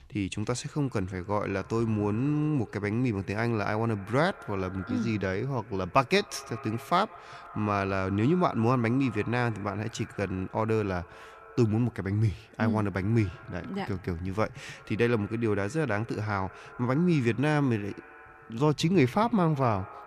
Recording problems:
echo of what is said; faint; throughout; 160 ms later, 20 dB below the speech

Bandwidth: 14 kHz